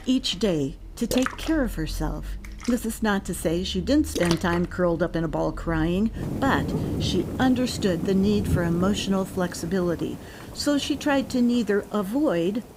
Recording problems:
rain or running water; loud; throughout; 8 dB below the speech

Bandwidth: 15.5 kHz